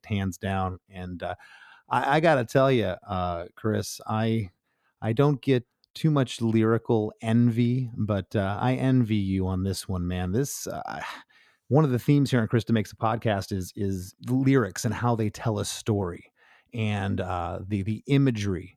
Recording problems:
none

